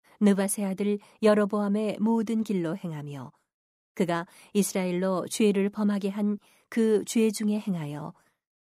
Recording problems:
none

